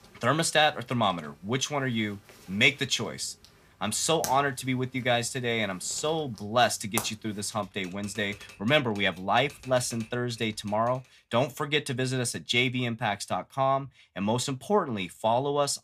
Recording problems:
household noises; noticeable; until 11 s; 15 dB below the speech

